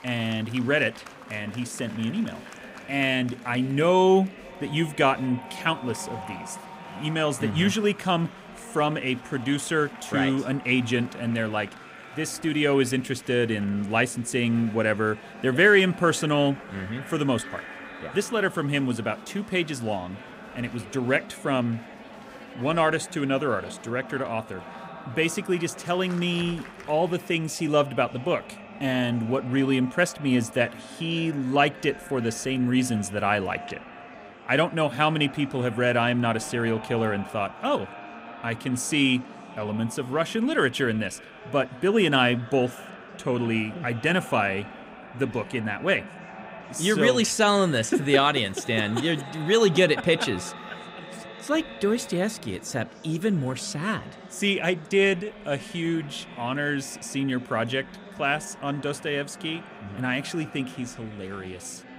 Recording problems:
echo of what is said; faint; throughout; 560 ms later, 20 dB below the speech
murmuring crowd; faint; throughout; 20 dB below the speech

